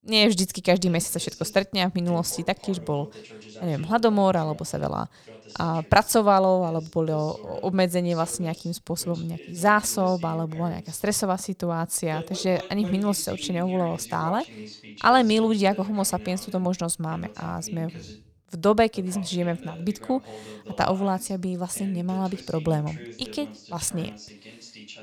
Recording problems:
voice in the background; noticeable; throughout; 20 dB below the speech

